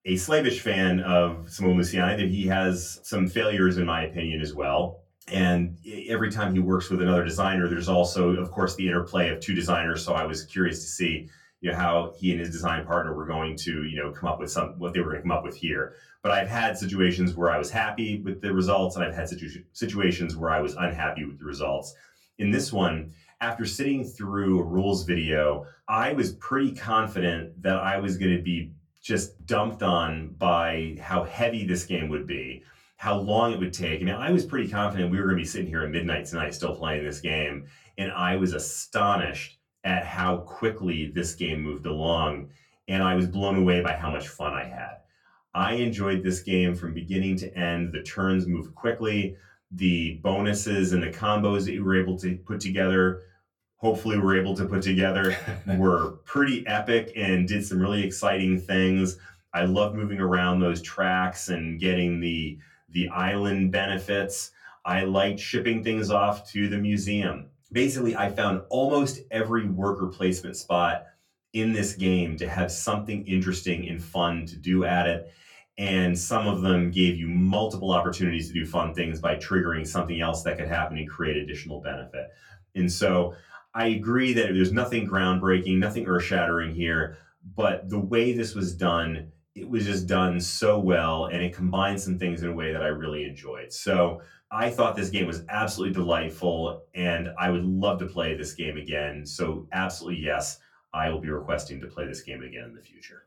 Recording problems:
off-mic speech; far
room echo; very slight; dies away in 0.2 s

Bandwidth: 17.5 kHz